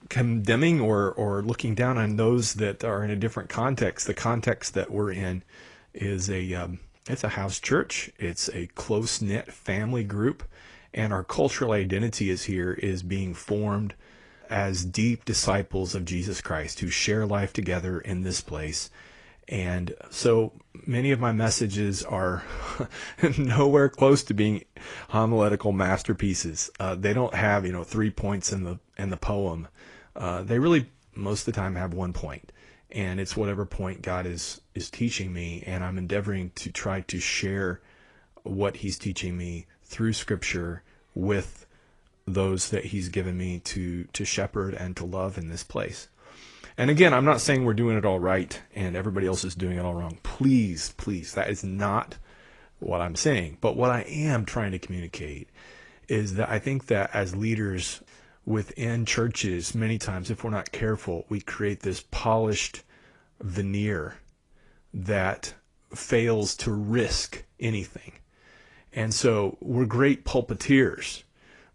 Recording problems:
garbled, watery; slightly; nothing above 10 kHz

